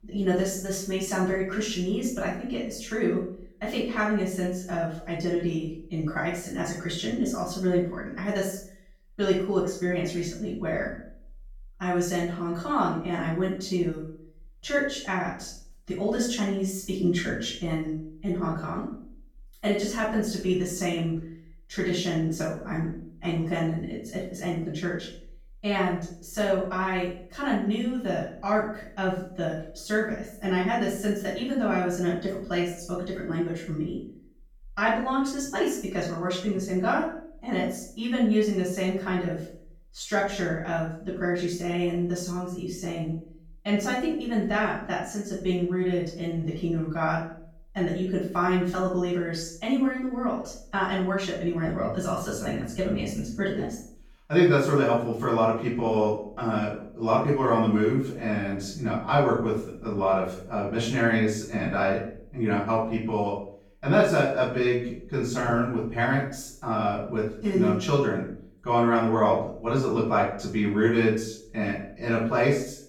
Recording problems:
off-mic speech; far
room echo; noticeable; dies away in 0.5 s

